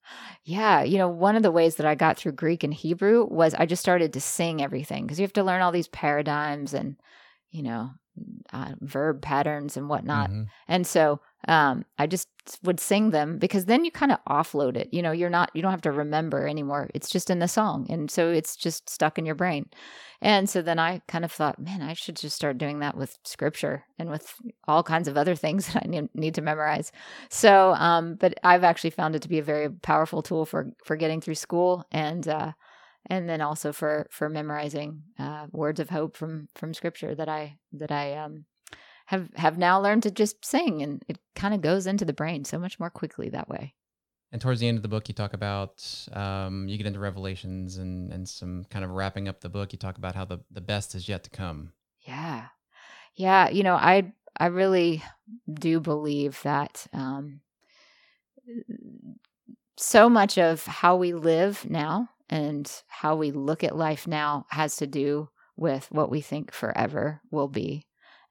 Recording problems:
none

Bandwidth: 17.5 kHz